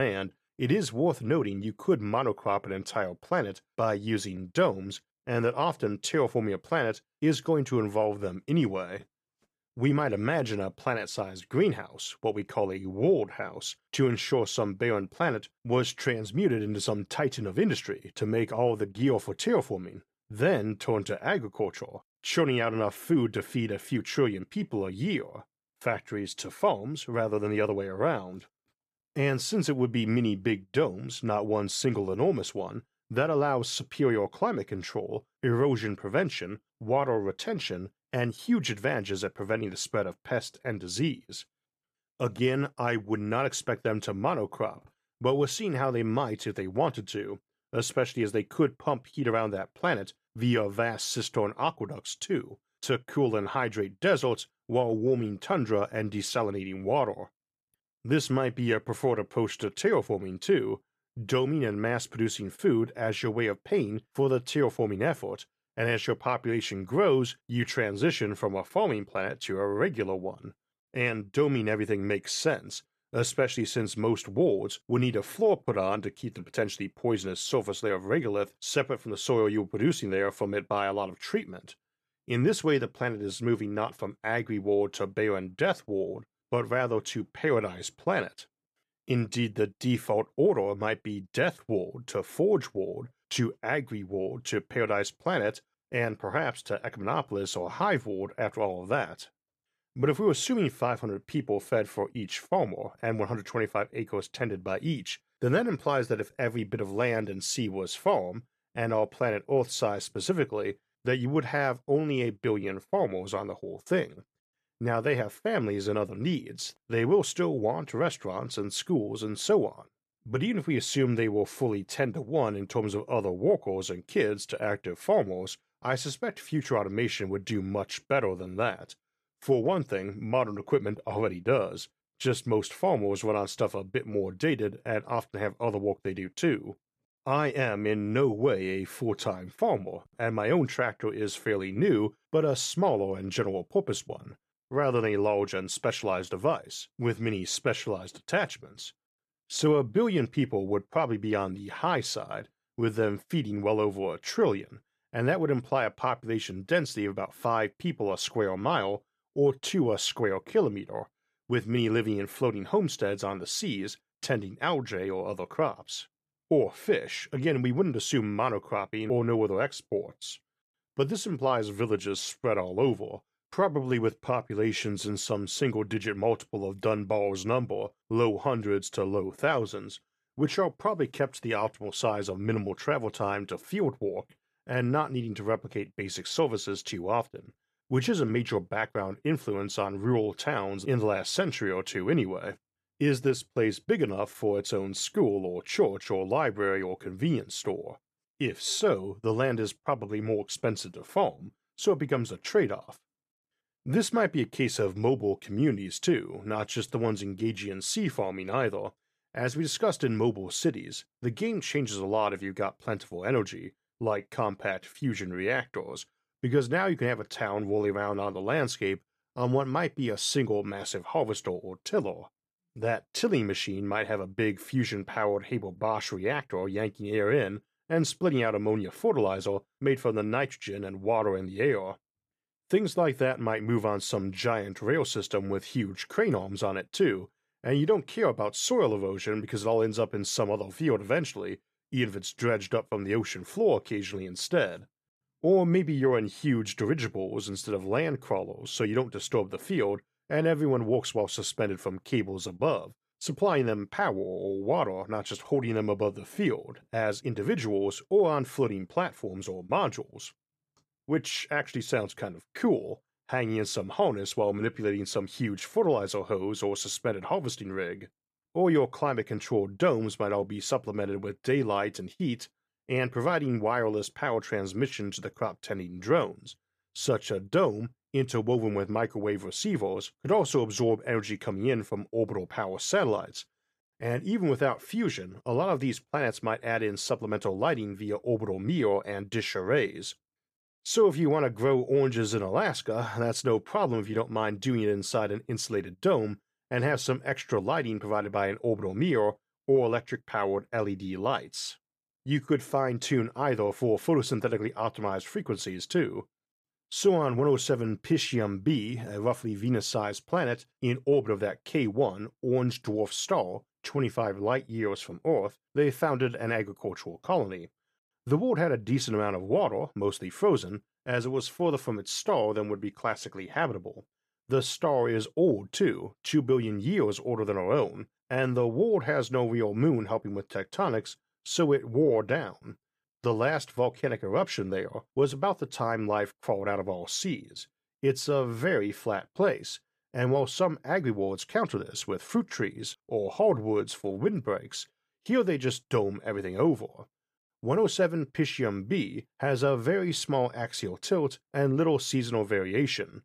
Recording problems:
abrupt cut into speech; at the start

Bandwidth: 14.5 kHz